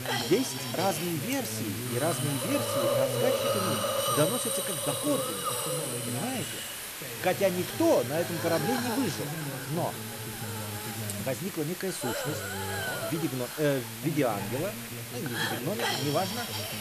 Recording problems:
voice in the background; loud; throughout; 8 dB below the speech
hiss; loud; throughout; 1 dB below the speech

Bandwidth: 14.5 kHz